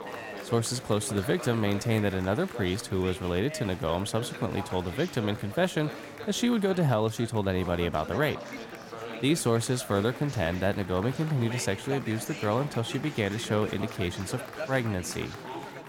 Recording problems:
chatter from many people; noticeable; throughout; 10 dB below the speech

